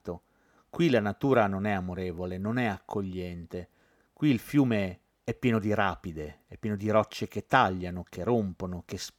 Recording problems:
none

